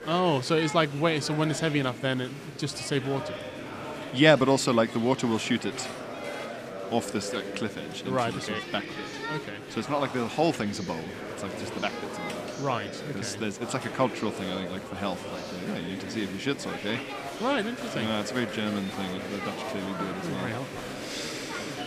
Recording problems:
murmuring crowd; loud; throughout; 8 dB below the speech

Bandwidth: 15 kHz